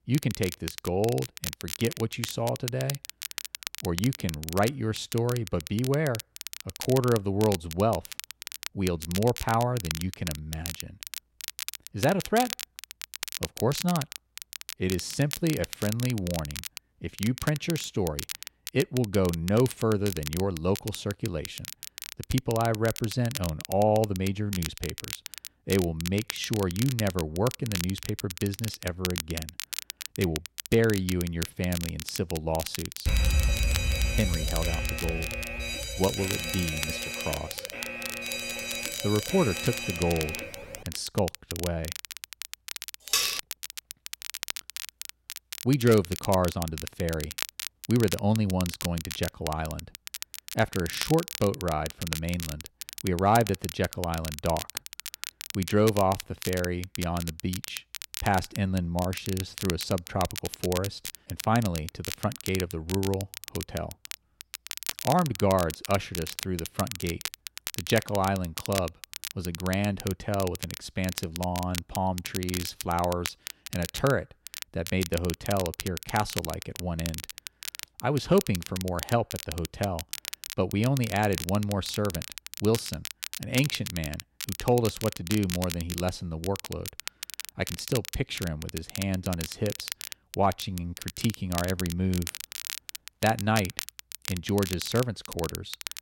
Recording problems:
crackle, like an old record; loud; 8 dB below the speech
alarm; loud; from 33 to 40 s; peak 4 dB above the speech
clattering dishes; loud; at 43 s; peak 4 dB above the speech

